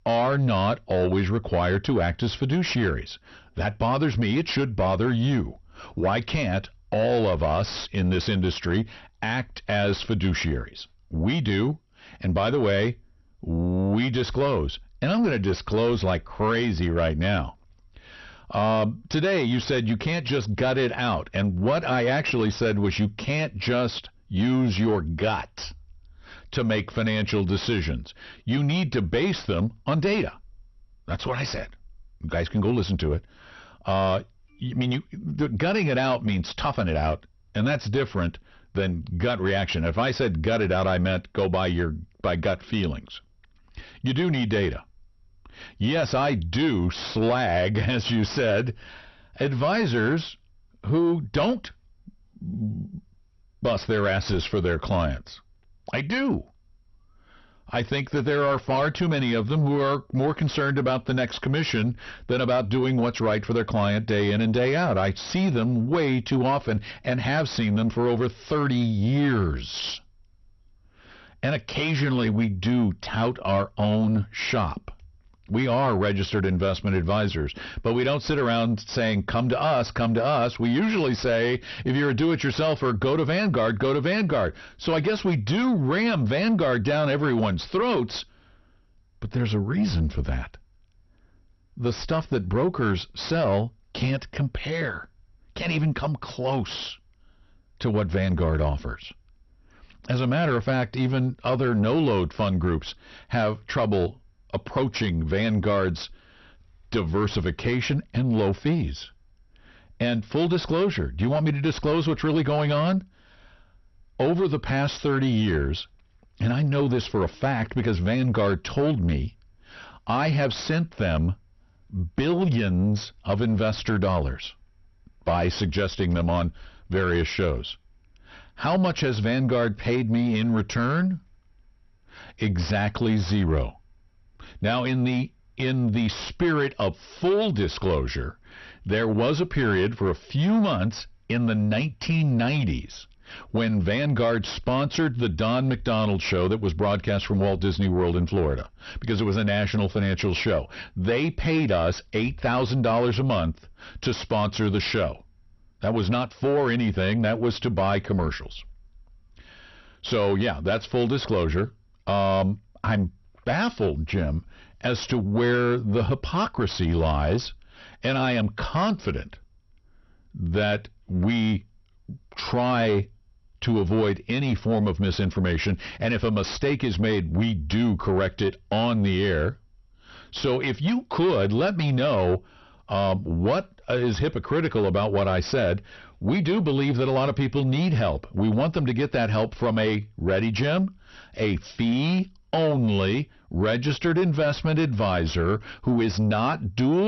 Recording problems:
distortion; slight; 10 dB below the speech
garbled, watery; slightly; nothing above 6 kHz
abrupt cut into speech; at the end

